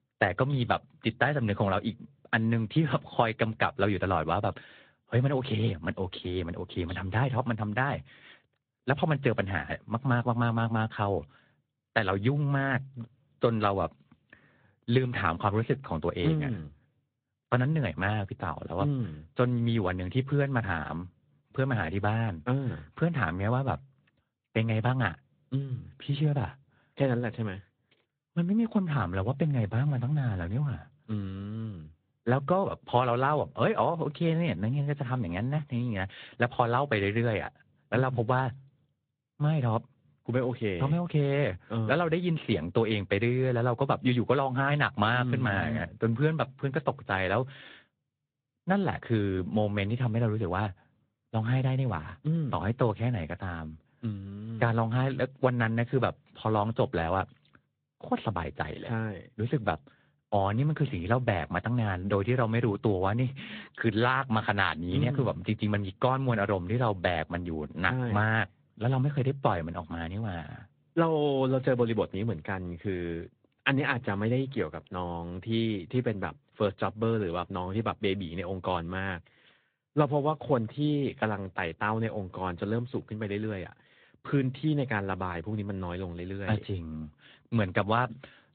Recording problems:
high frequencies cut off; severe; nothing above 4 kHz
garbled, watery; slightly

